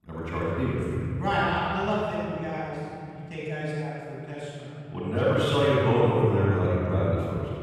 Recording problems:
room echo; strong; dies away in 3 s
off-mic speech; far

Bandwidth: 15.5 kHz